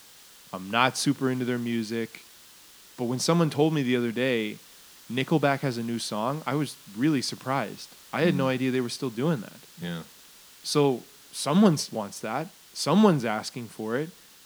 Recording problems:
hiss; faint; throughout; 20 dB below the speech

